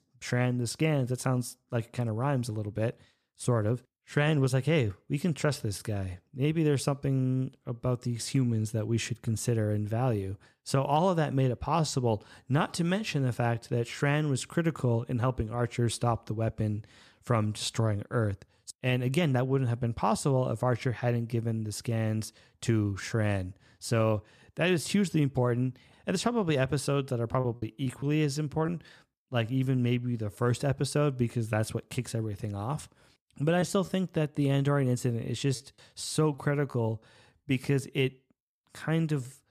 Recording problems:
choppy; very; from 27 to 30 s and from 34 to 37 s; 5% of the speech affected

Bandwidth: 14.5 kHz